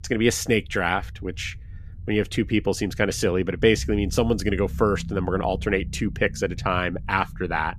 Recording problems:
low rumble; faint; throughout; 25 dB below the speech

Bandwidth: 14 kHz